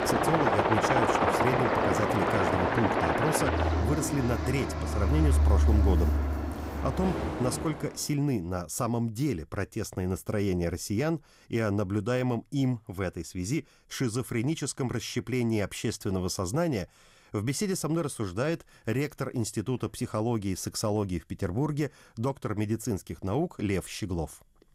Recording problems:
train or aircraft noise; very loud; until 7.5 s; 4 dB above the speech

